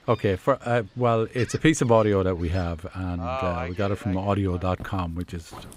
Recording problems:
animal sounds; noticeable; throughout; 10 dB below the speech

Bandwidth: 15.5 kHz